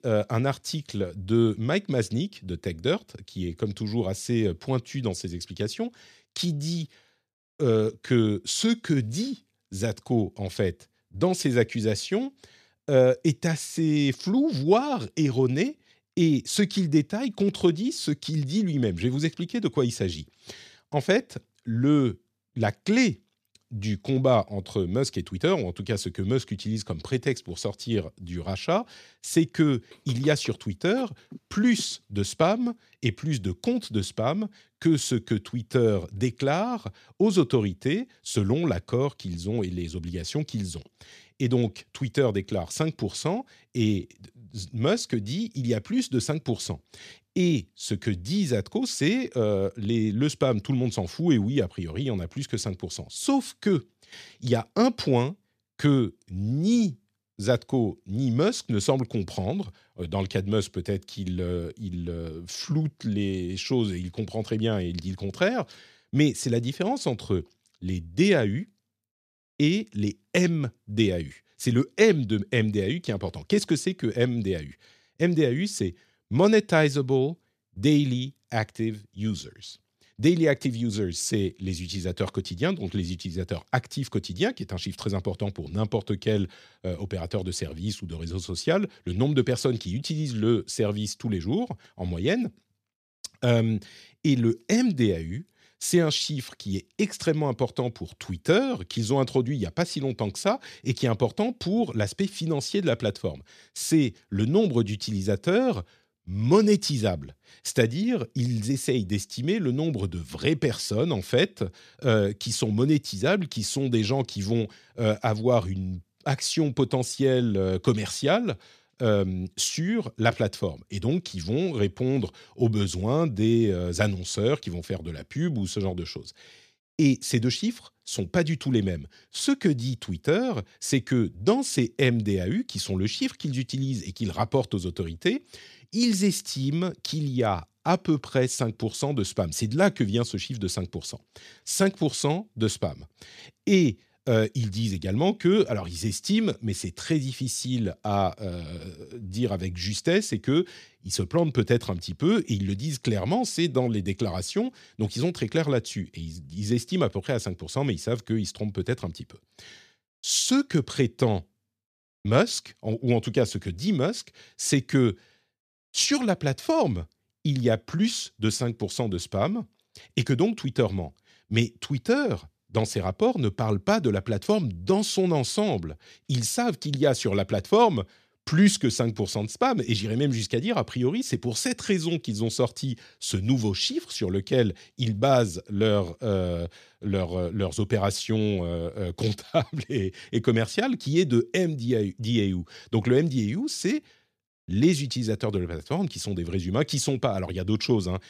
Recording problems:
none

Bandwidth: 14.5 kHz